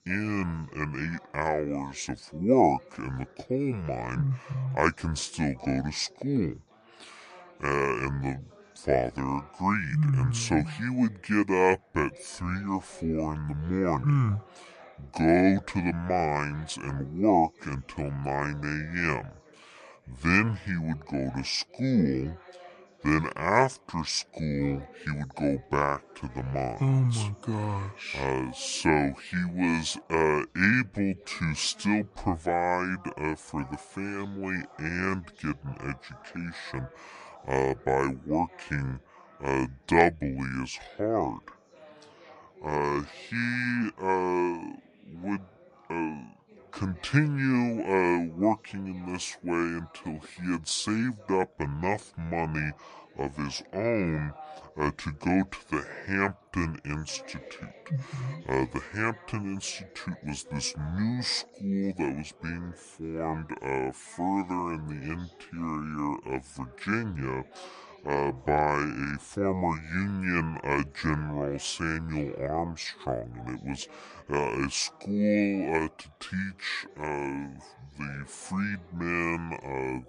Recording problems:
wrong speed and pitch; too slow and too low; 0.7 times normal speed
background chatter; faint; throughout; 3 voices, 25 dB below the speech

